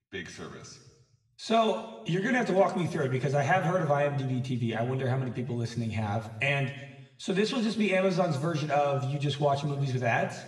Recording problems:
off-mic speech; far
room echo; noticeable; dies away in 0.9 s

